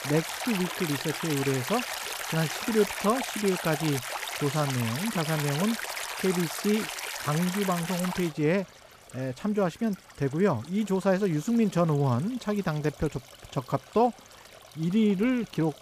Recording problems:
rain or running water; loud; throughout; 5 dB below the speech

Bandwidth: 14.5 kHz